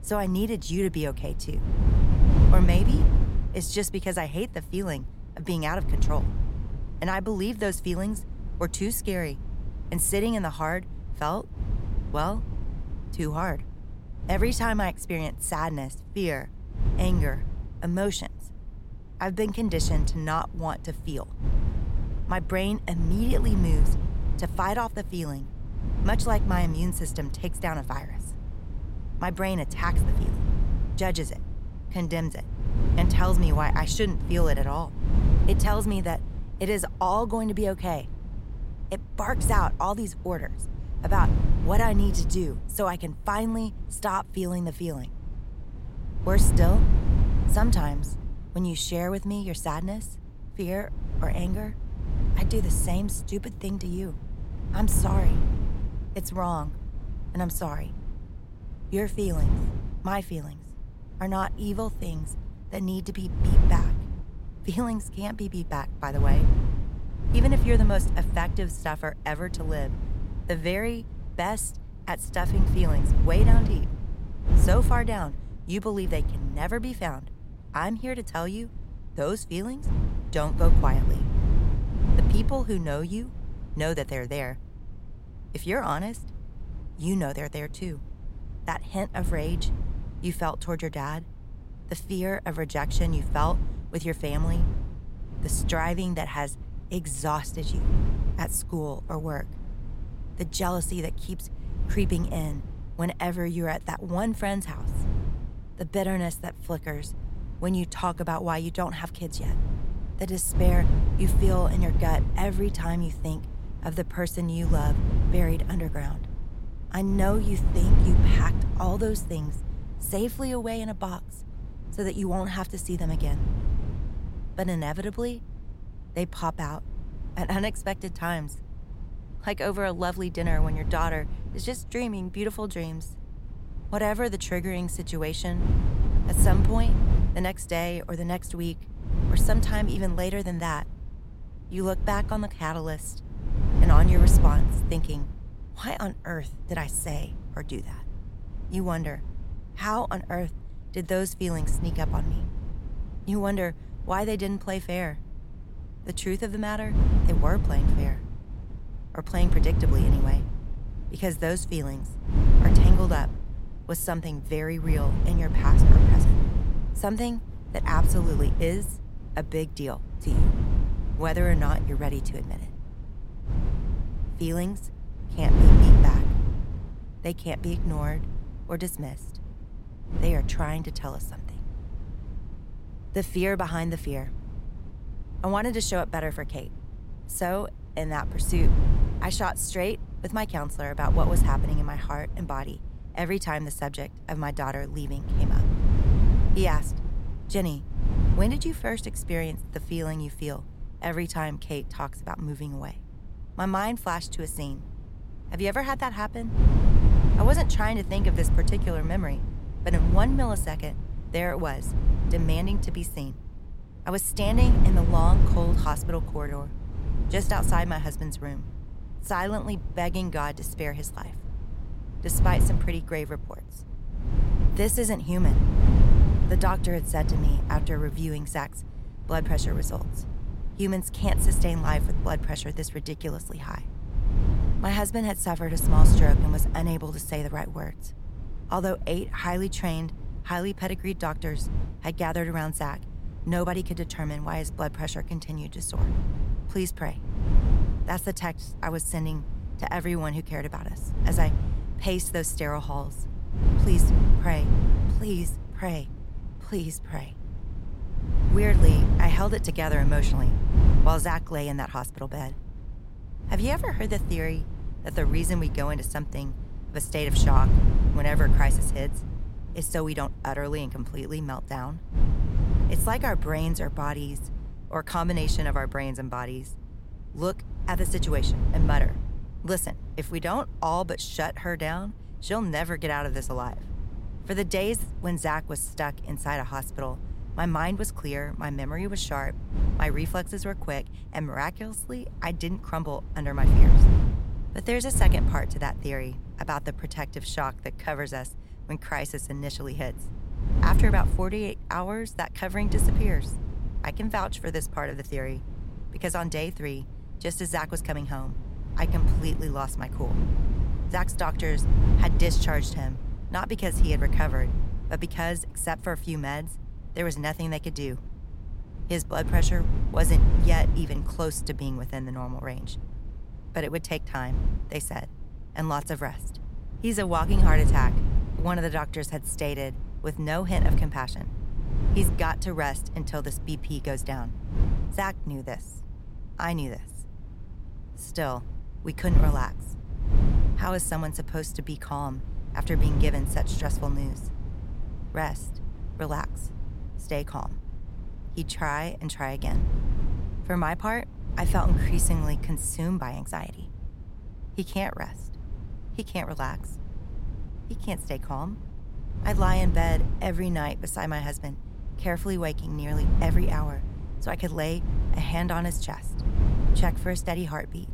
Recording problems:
wind noise on the microphone; heavy; 10 dB below the speech

